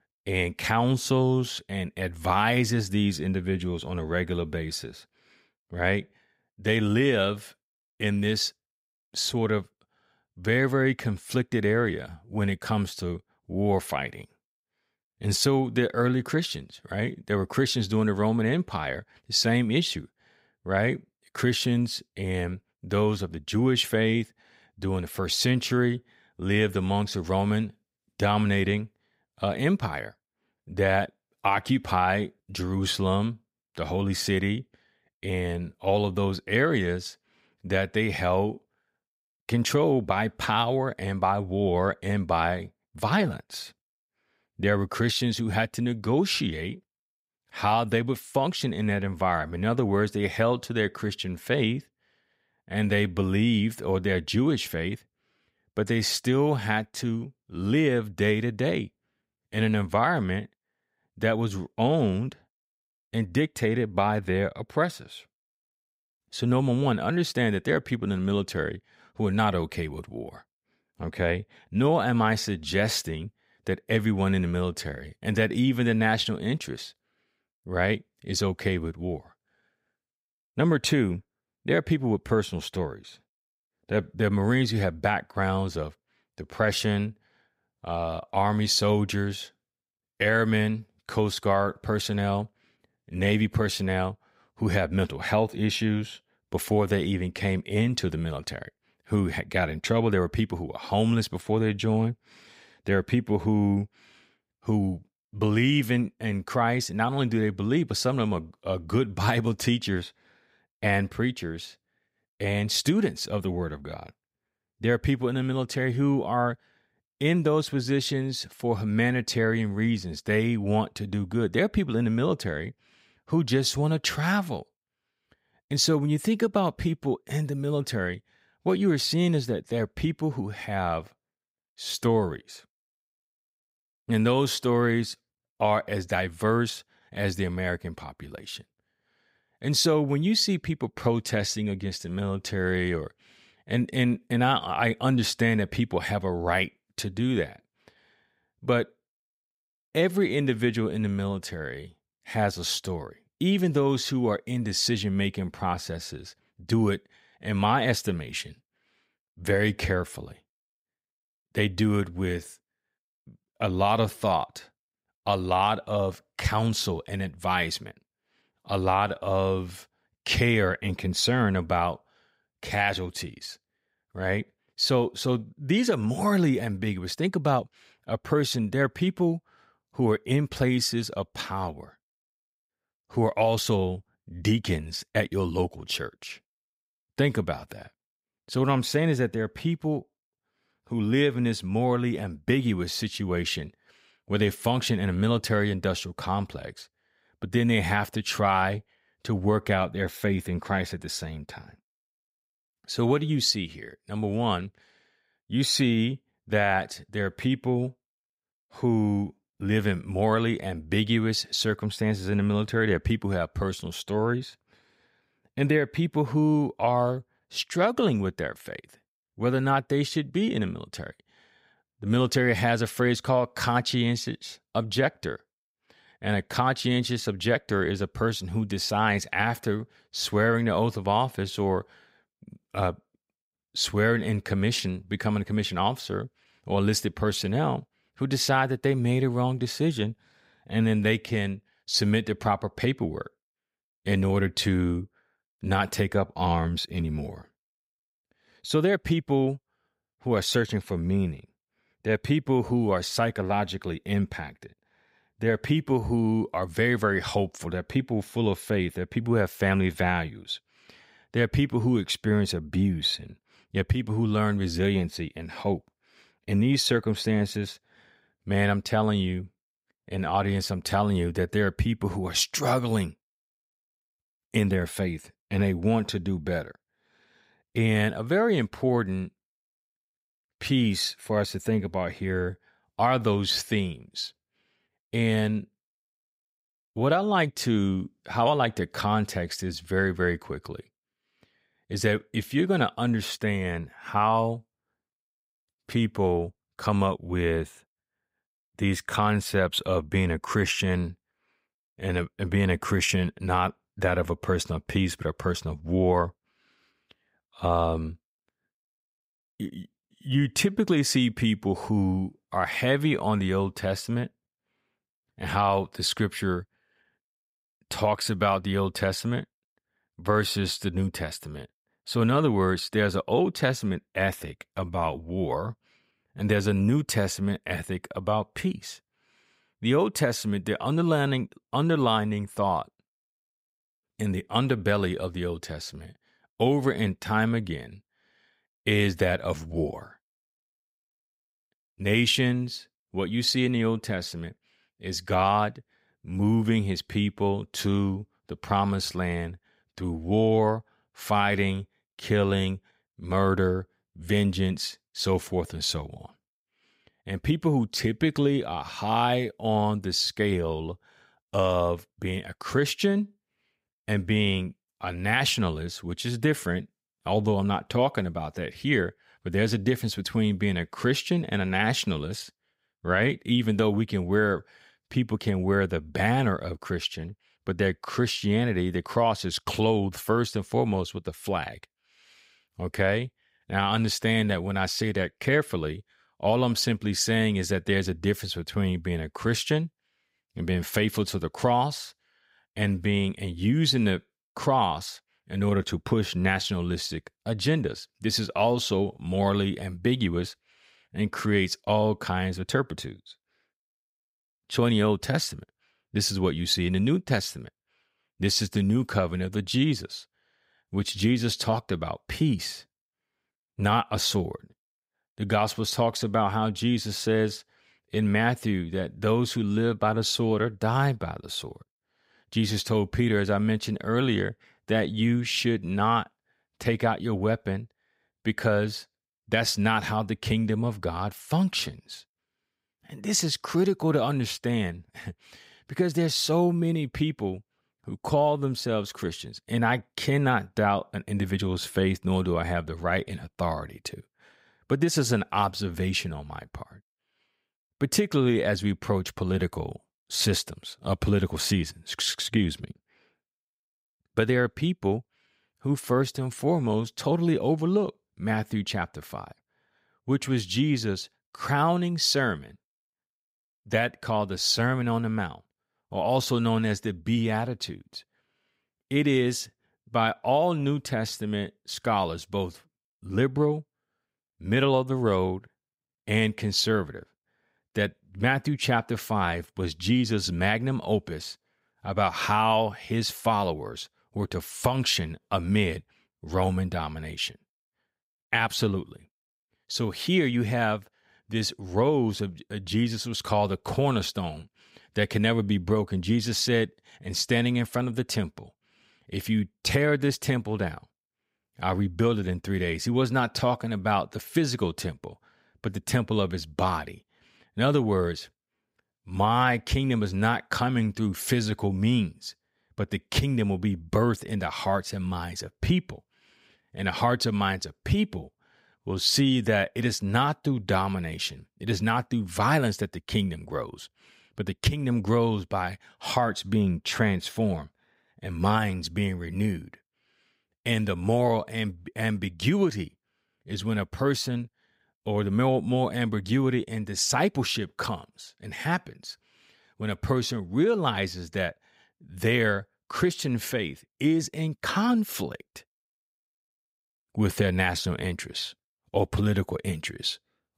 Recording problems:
none

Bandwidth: 15.5 kHz